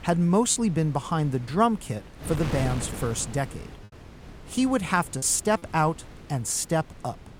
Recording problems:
wind noise on the microphone; occasional gusts; 15 dB below the speech
choppy; occasionally; 2% of the speech affected

